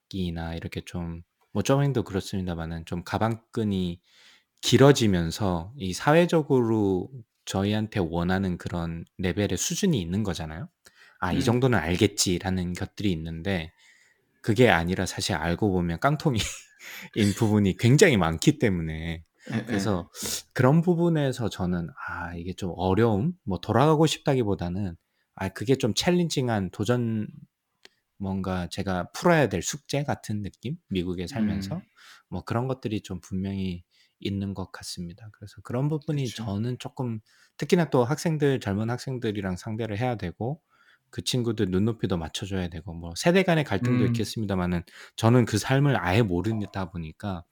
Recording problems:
none

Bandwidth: 18.5 kHz